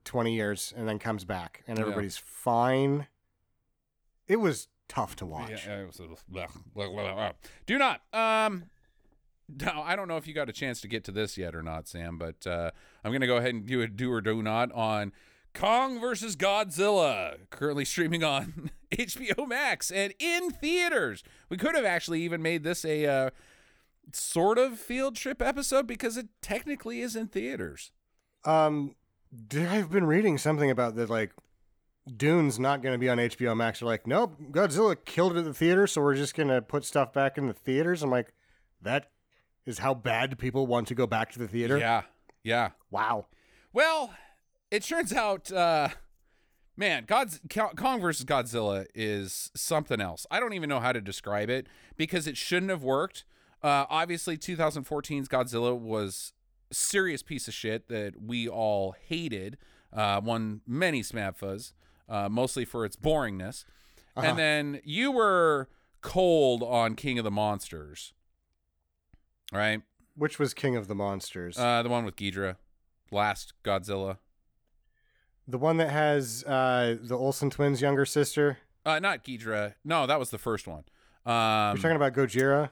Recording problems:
none

